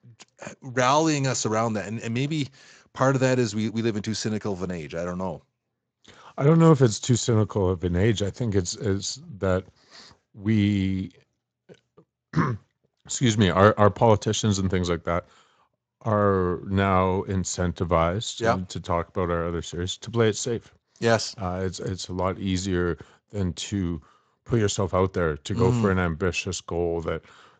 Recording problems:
garbled, watery; slightly; nothing above 7.5 kHz

